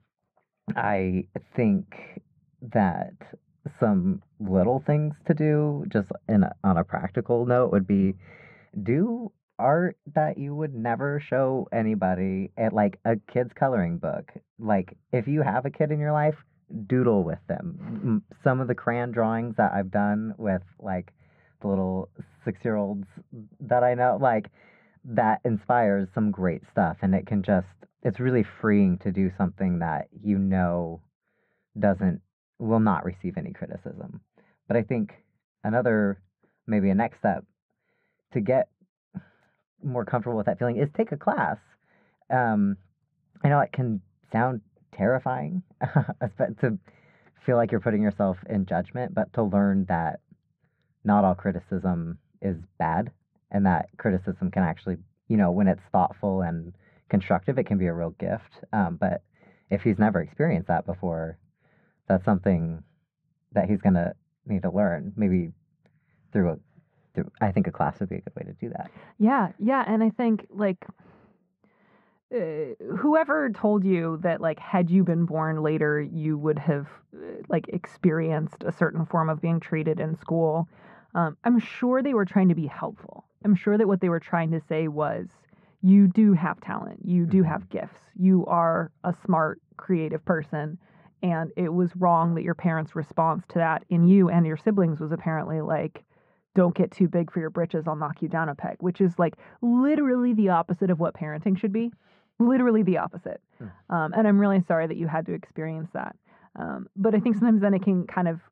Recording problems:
muffled; very; fading above 1.5 kHz

